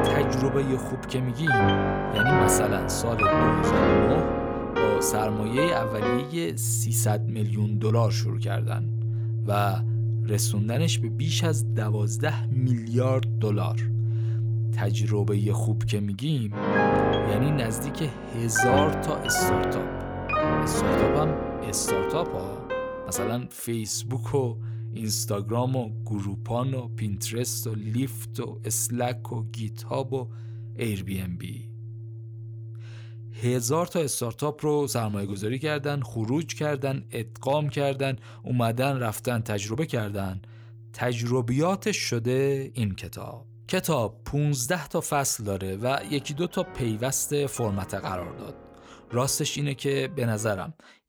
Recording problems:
background music; very loud; throughout; 1 dB above the speech

